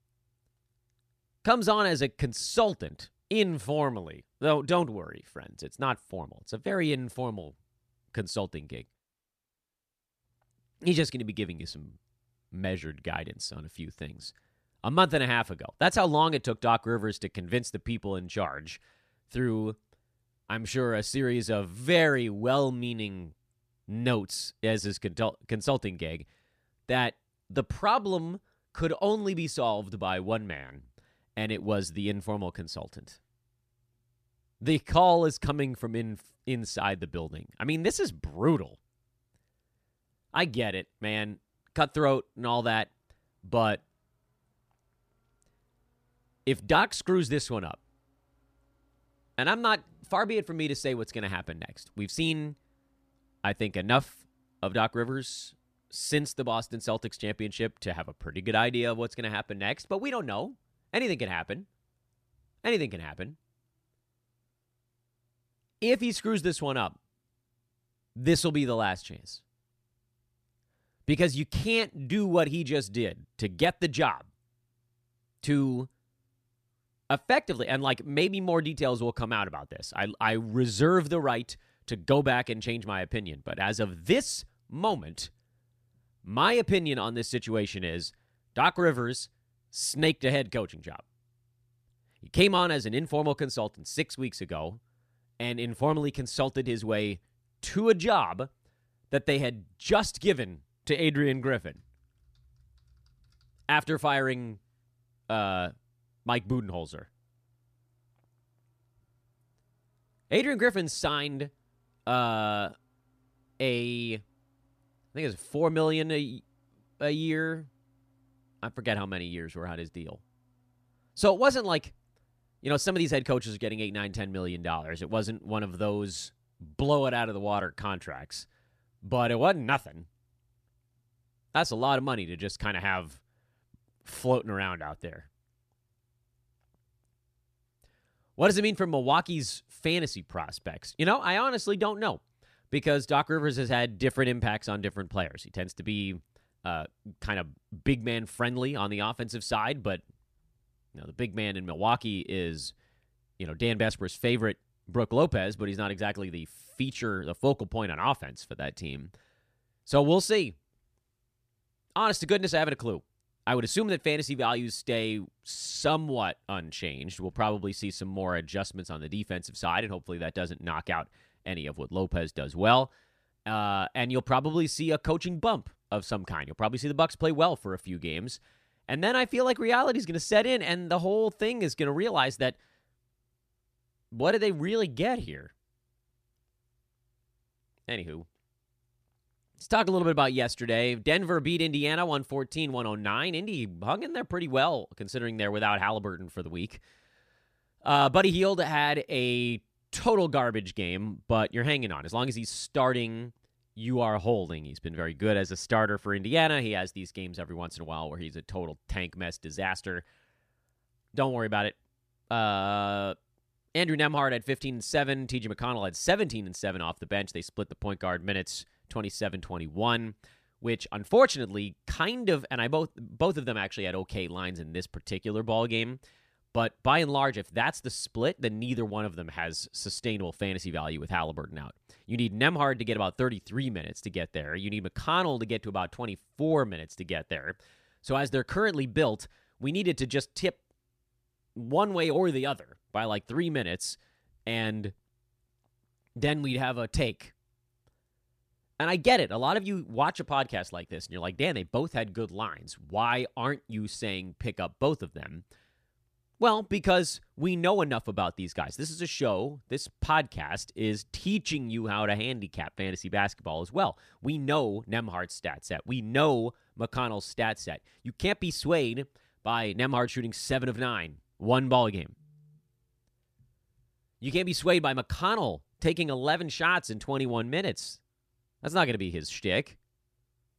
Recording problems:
none

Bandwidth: 14.5 kHz